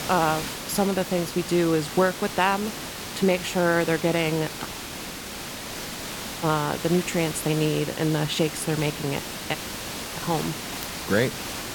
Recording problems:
hiss; loud; throughout; 7 dB below the speech
audio cutting out; at 4.5 s for 2 s and at 9.5 s for 0.5 s

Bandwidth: 17.5 kHz